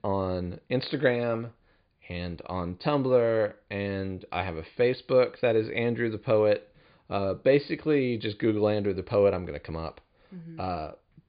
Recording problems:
high frequencies cut off; severe; nothing above 5 kHz

